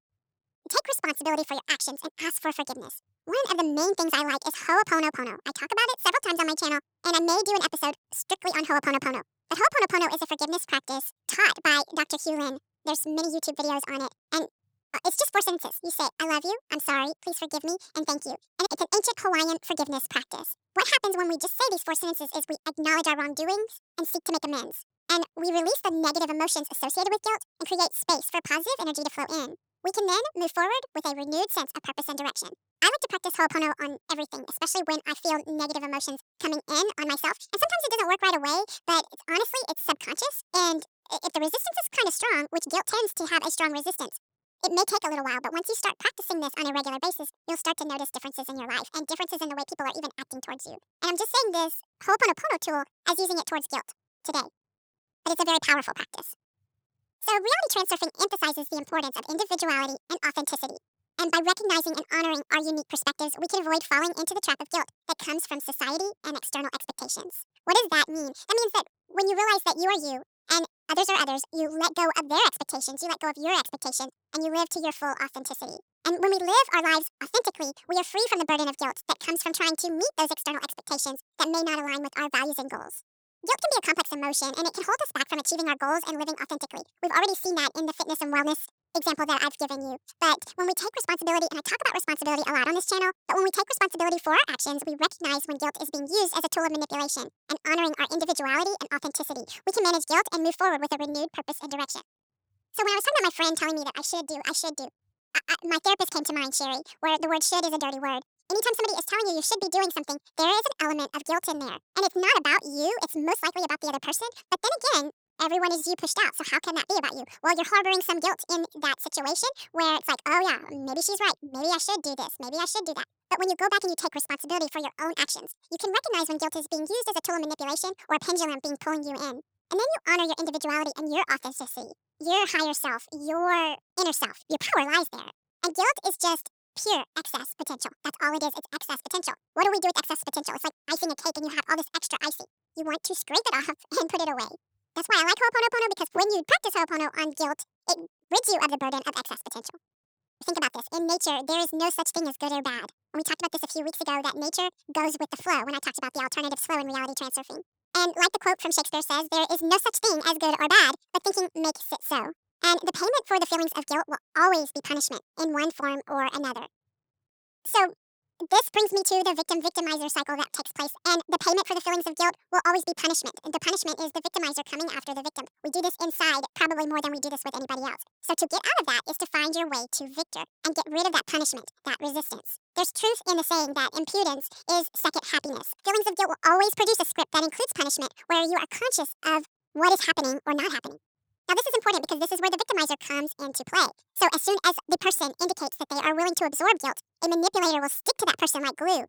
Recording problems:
wrong speed and pitch; too fast and too high; 1.7 times normal speed

